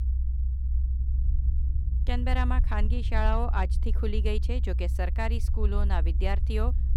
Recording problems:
low rumble; noticeable; throughout; 15 dB below the speech

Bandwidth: 17.5 kHz